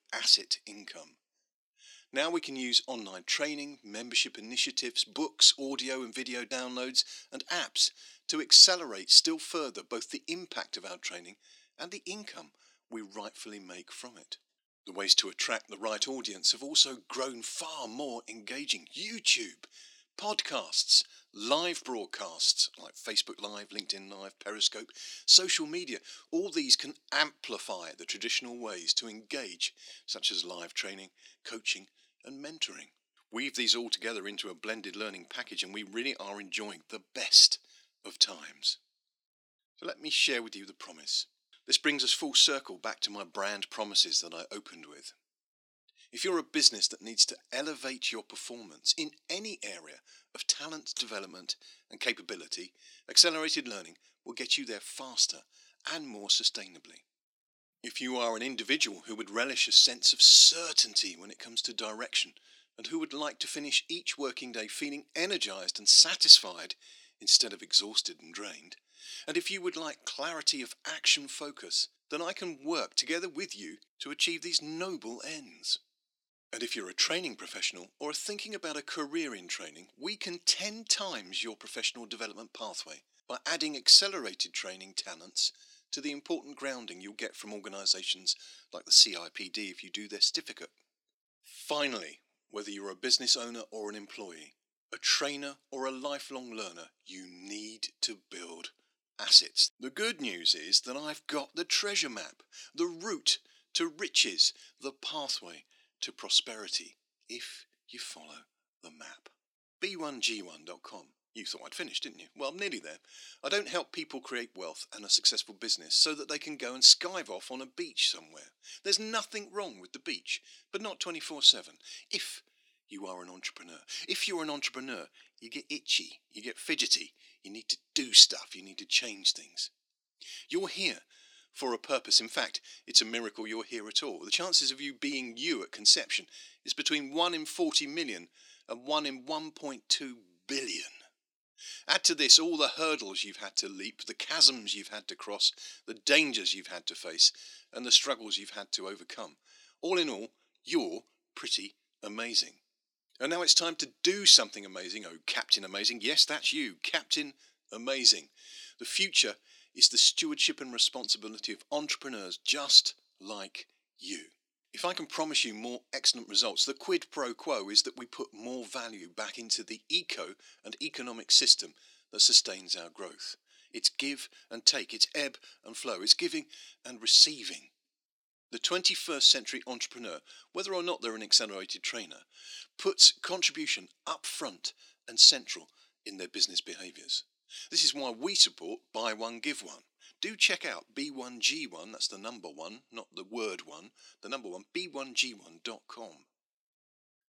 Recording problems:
thin; somewhat; fading below 250 Hz

